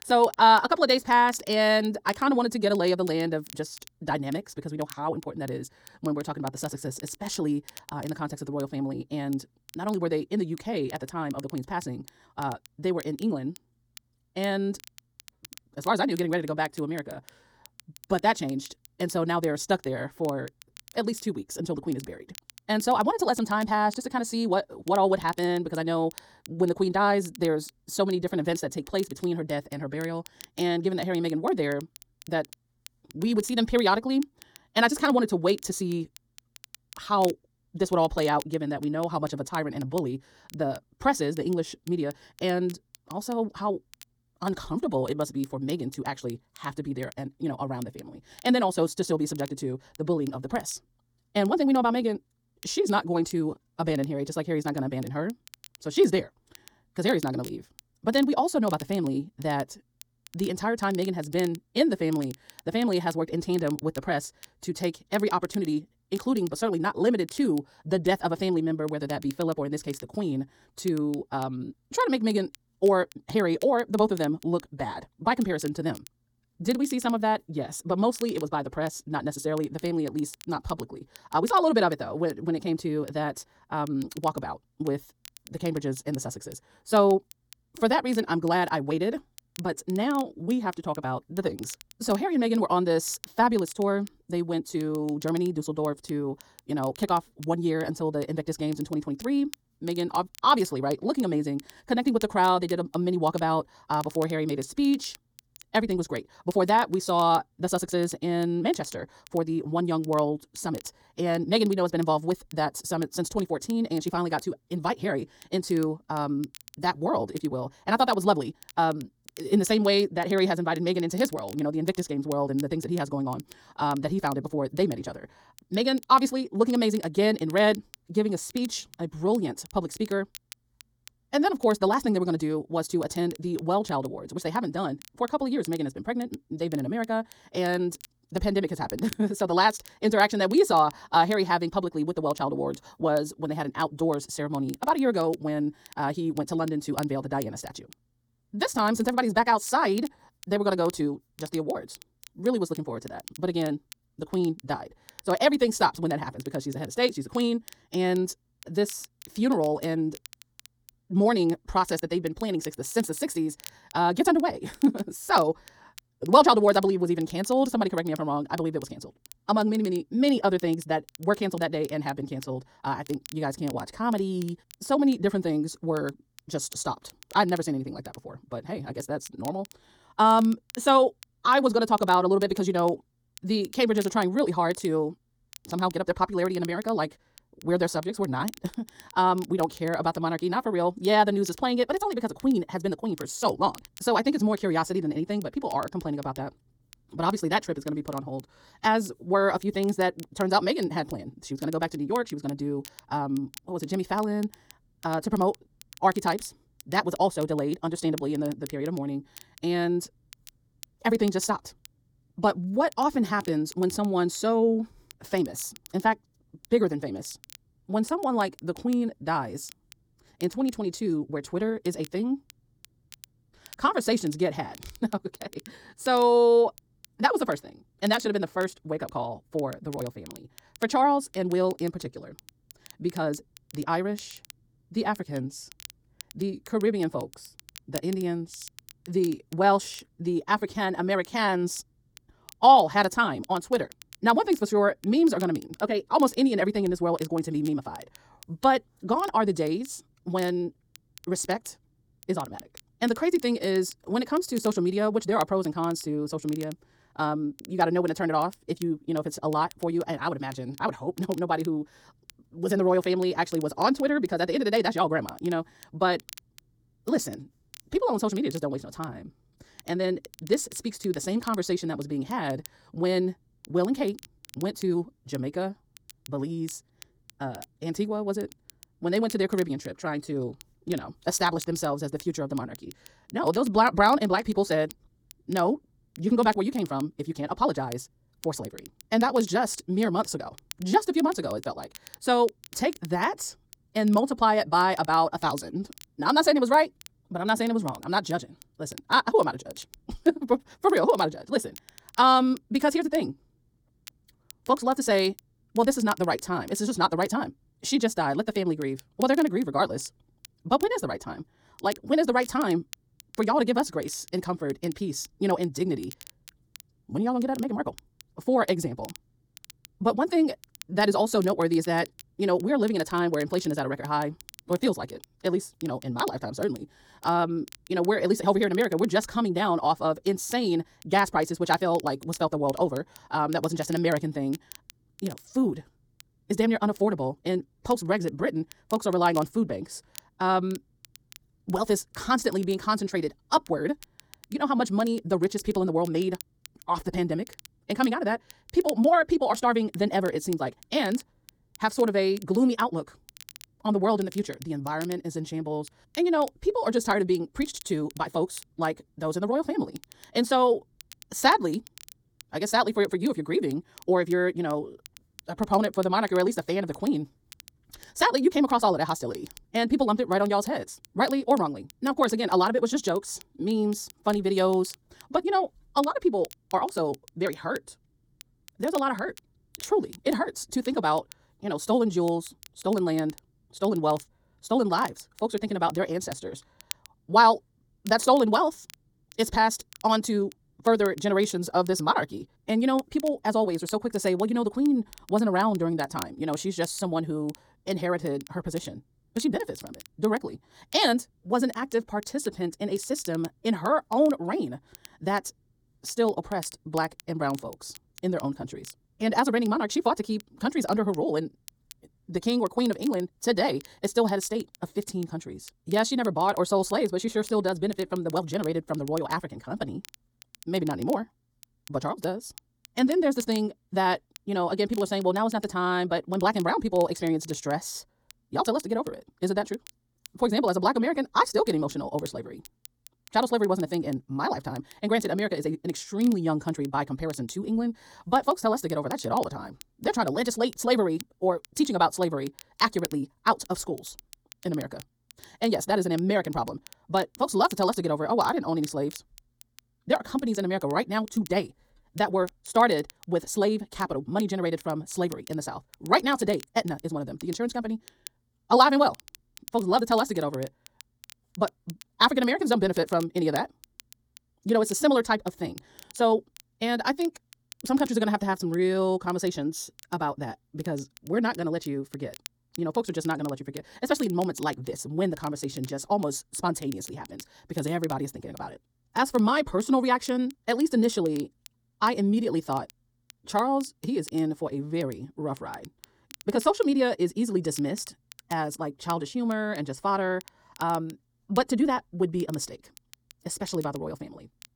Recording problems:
wrong speed, natural pitch; too fast; 1.7 times normal speed
crackle, like an old record; faint; 20 dB below the speech

